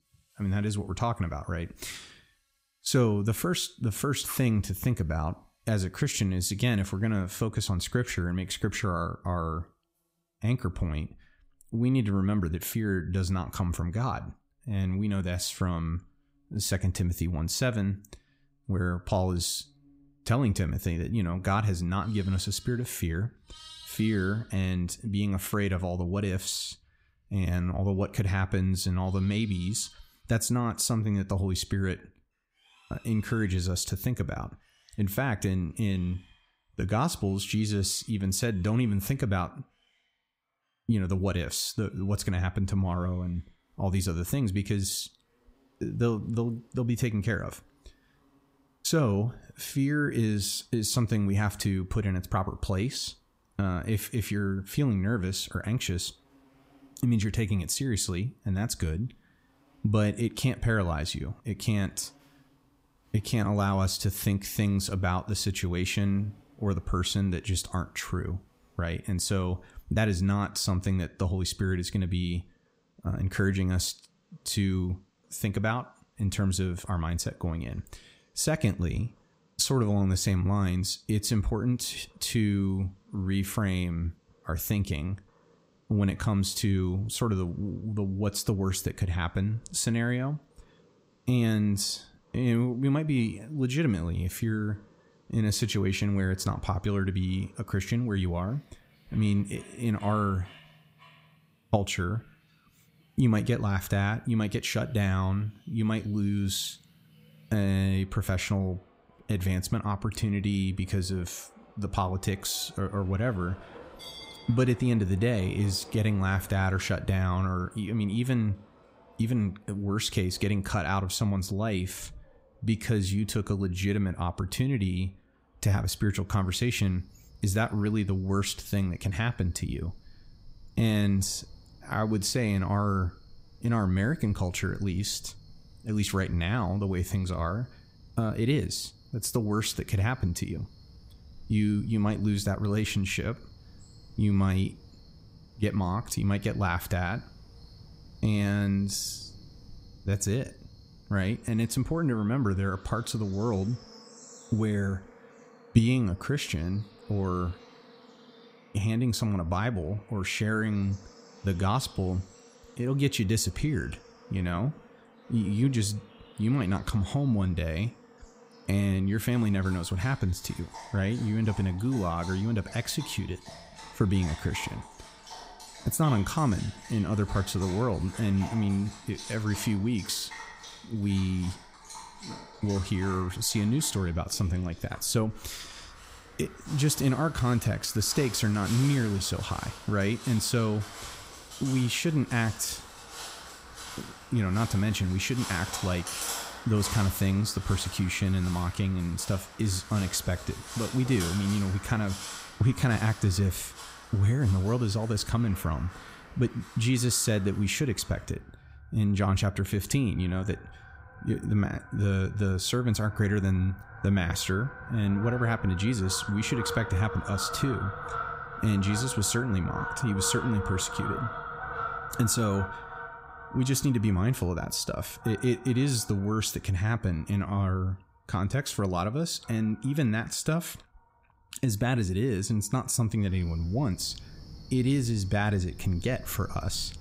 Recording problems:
animal sounds; noticeable; throughout; 15 dB below the speech

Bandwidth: 15.5 kHz